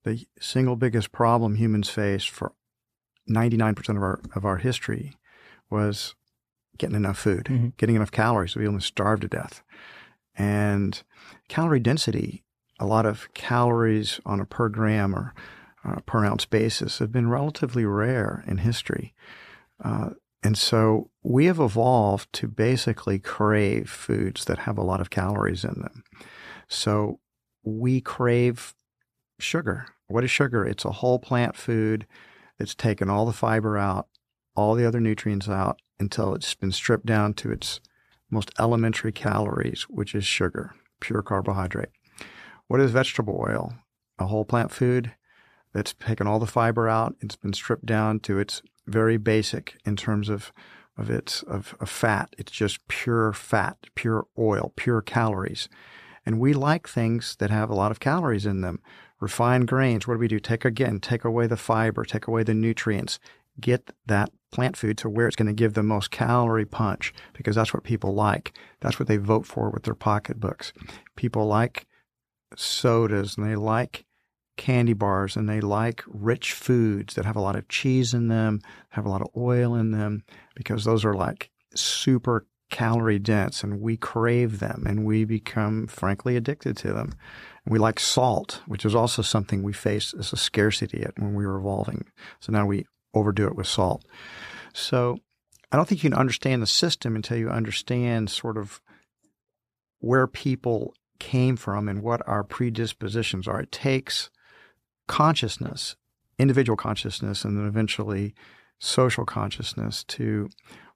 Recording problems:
uneven, jittery; strongly; from 3 s to 1:47

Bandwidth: 14.5 kHz